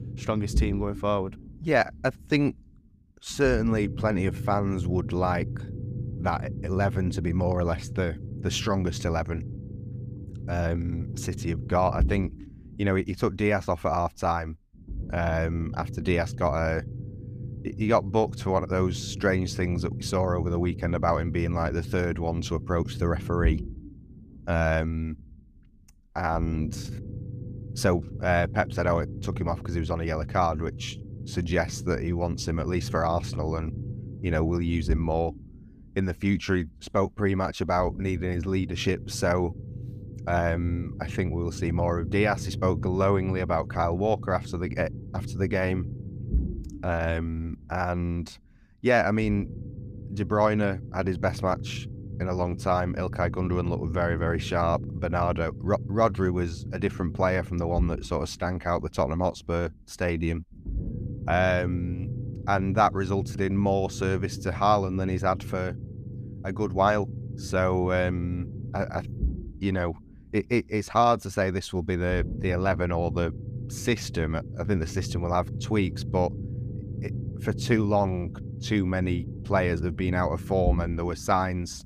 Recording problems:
low rumble; noticeable; throughout; 20 dB below the speech

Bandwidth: 15 kHz